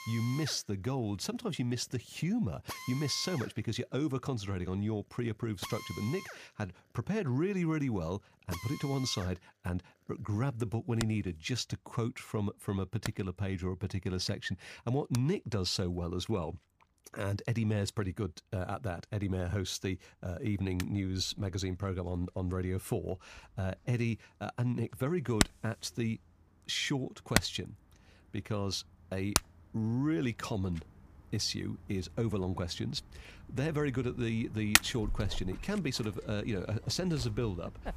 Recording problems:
machinery noise; loud; throughout; 2 dB below the speech

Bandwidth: 15 kHz